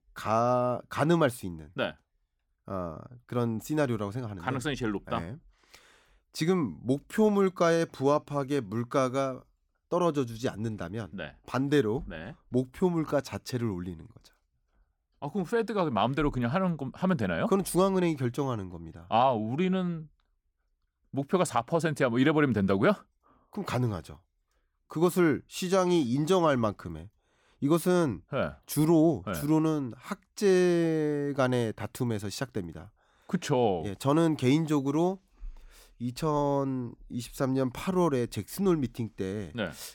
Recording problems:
none

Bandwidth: 17.5 kHz